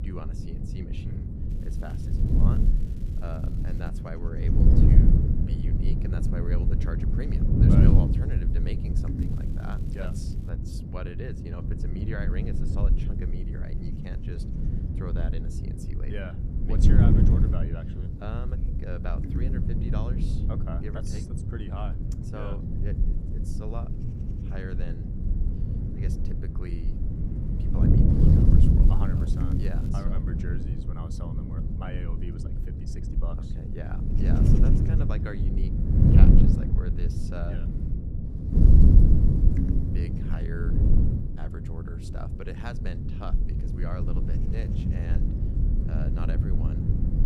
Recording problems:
wind noise on the microphone; heavy; 4 dB above the speech
crackling; noticeable; from 1.5 to 4 s, from 9 to 10 s and from 29 to 30 s; 20 dB below the speech

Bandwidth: 14.5 kHz